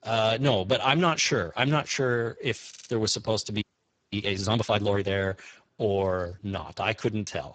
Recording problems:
garbled, watery; badly
audio stuttering; at 2.5 s
audio freezing; at 3.5 s for 0.5 s

